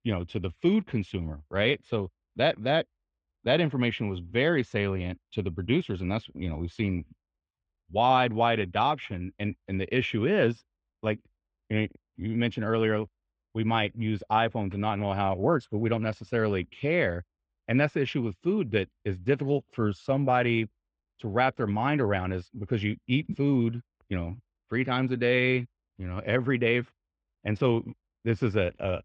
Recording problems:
muffled; very; fading above 3.5 kHz

